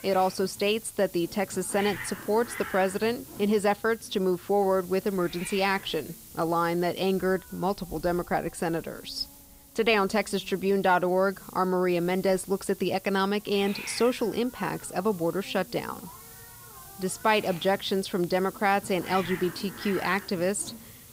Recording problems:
hiss; noticeable; throughout; 15 dB below the speech

